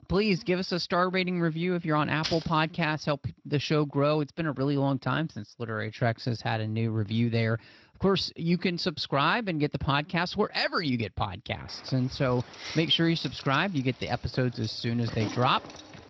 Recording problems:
garbled, watery; slightly
jangling keys; noticeable; at 2 s and from 12 s on; peak 6 dB below the speech

